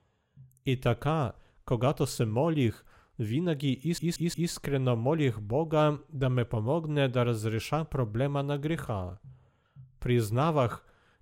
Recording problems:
audio stuttering; at 4 s

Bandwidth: 16 kHz